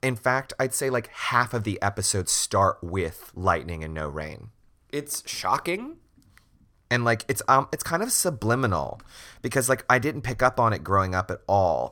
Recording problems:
none

